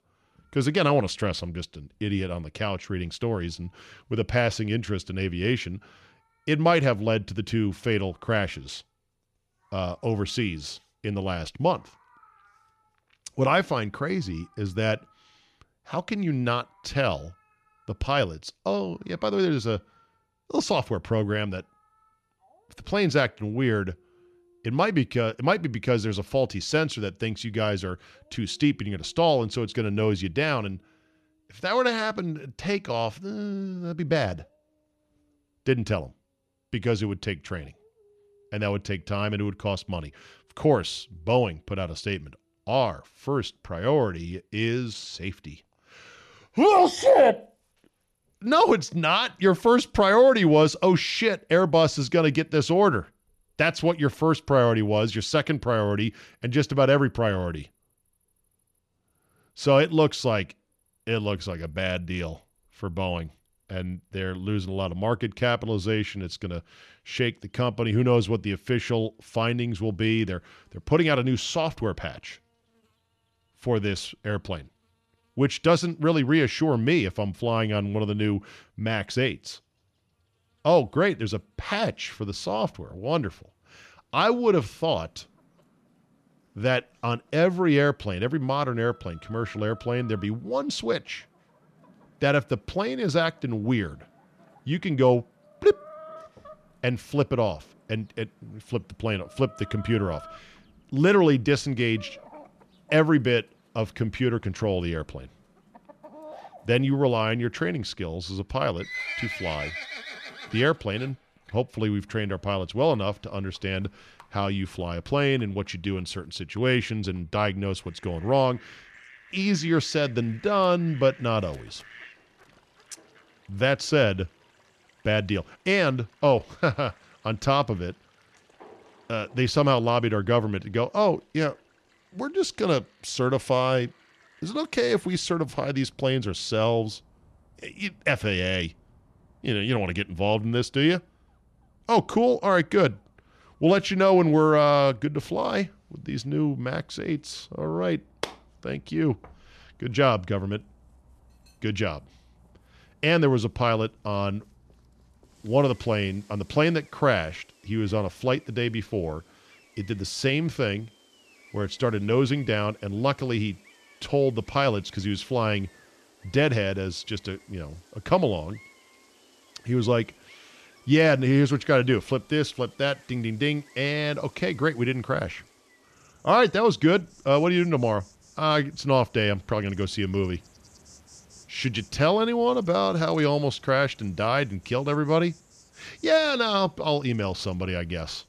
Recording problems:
animal sounds; faint; throughout; 25 dB below the speech

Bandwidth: 13.5 kHz